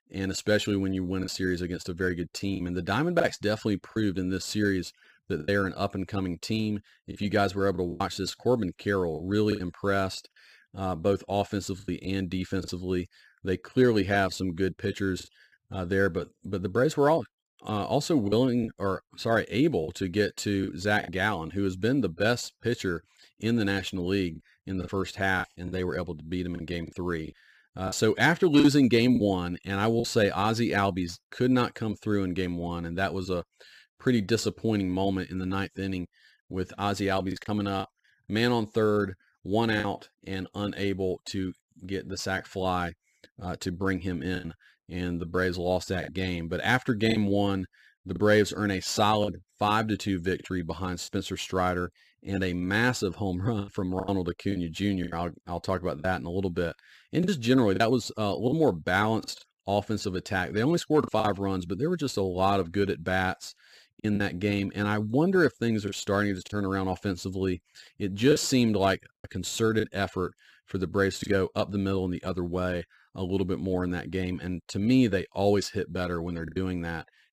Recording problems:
choppy; occasionally; 4% of the speech affected

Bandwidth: 15 kHz